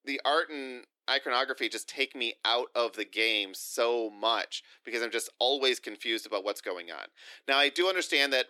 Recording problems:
thin; somewhat; fading below 300 Hz

